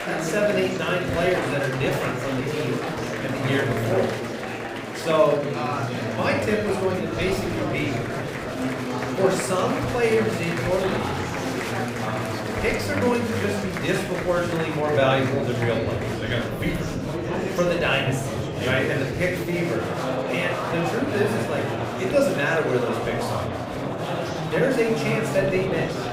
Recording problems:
room echo; noticeable; dies away in 0.5 s
off-mic speech; somewhat distant
murmuring crowd; loud; throughout; 3 dB below the speech

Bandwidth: 15.5 kHz